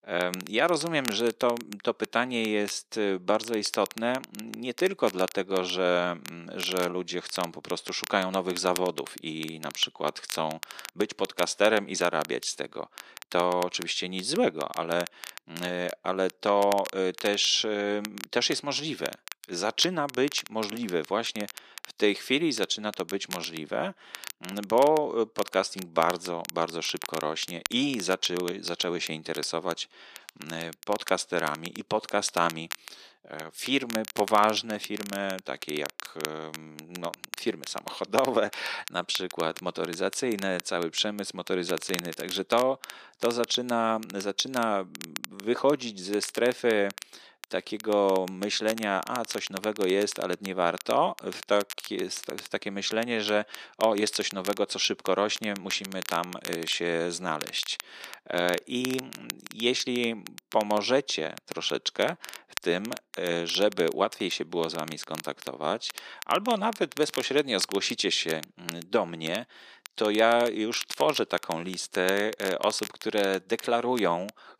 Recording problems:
thin; somewhat; fading below 350 Hz
crackle, like an old record; noticeable; 15 dB below the speech

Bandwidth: 14.5 kHz